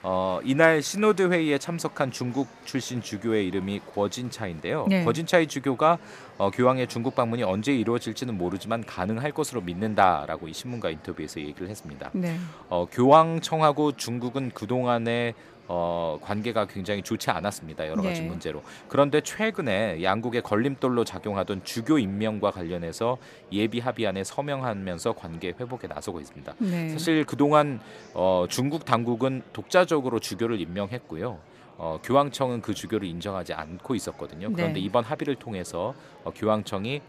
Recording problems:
murmuring crowd; faint; throughout; 25 dB below the speech

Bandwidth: 14.5 kHz